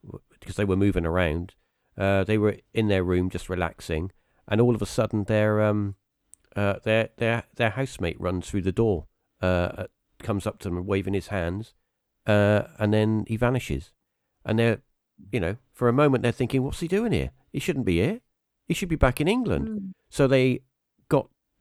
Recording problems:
none

